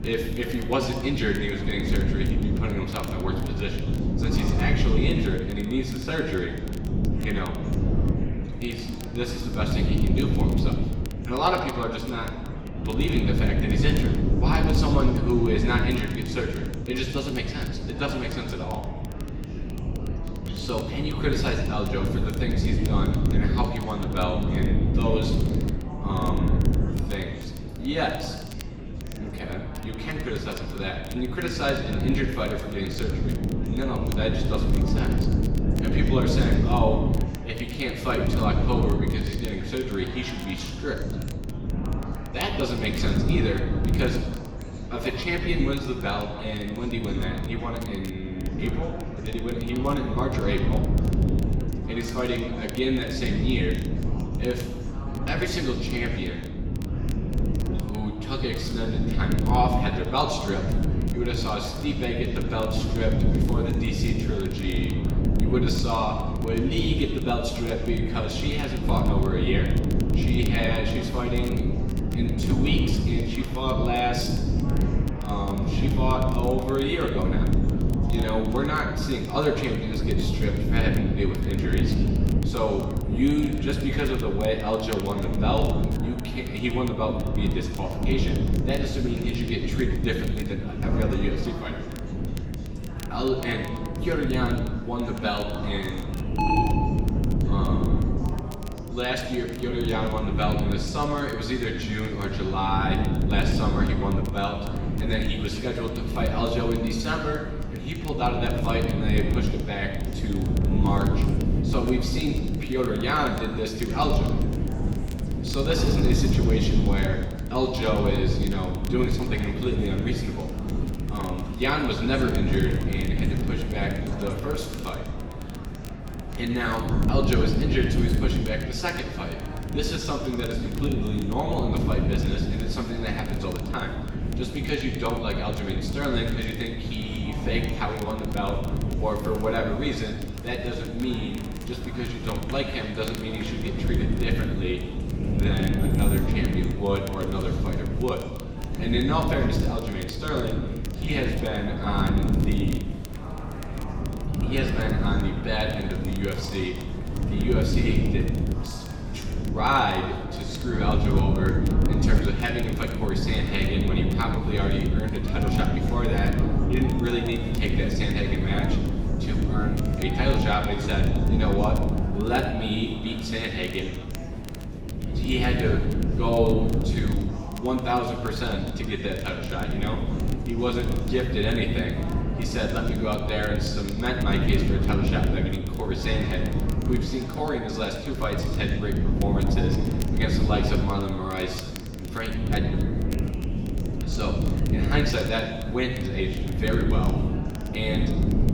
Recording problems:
off-mic speech; far
room echo; noticeable; dies away in 1 s
wind noise on the microphone; heavy; 7 dB below the speech
murmuring crowd; noticeable; throughout; 15 dB below the speech
crackle, like an old record; noticeable; 20 dB below the speech
alarm; loud; at 1:36; peak 5 dB above the speech
jangling keys; noticeable; at 2:26; peak 7 dB below the speech

